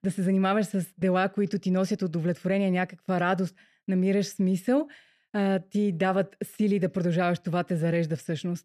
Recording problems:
none

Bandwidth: 14 kHz